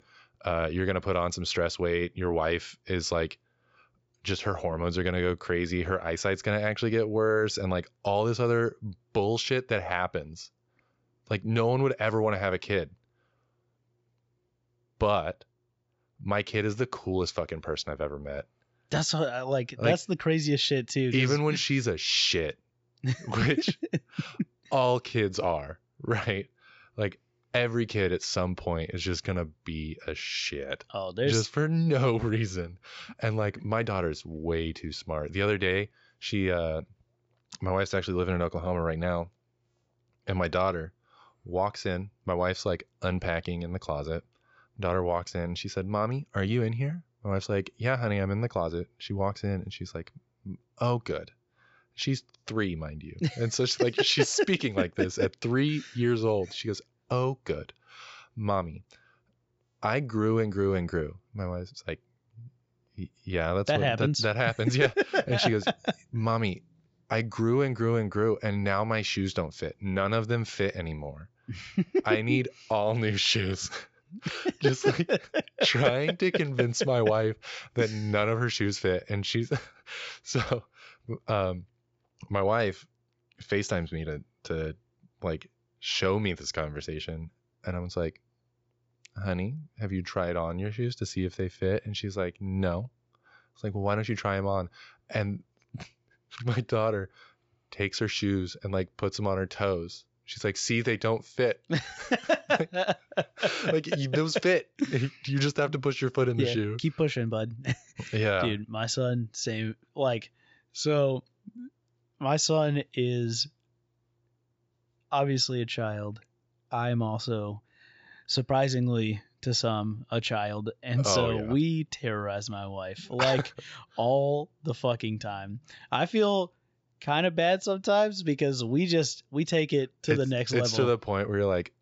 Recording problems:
high frequencies cut off; noticeable; nothing above 7.5 kHz

